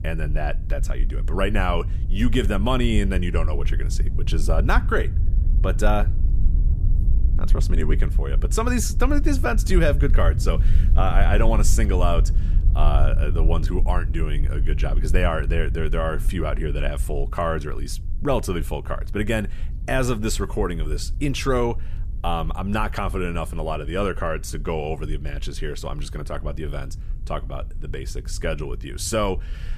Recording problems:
low rumble; noticeable; throughout; 15 dB below the speech

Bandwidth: 14.5 kHz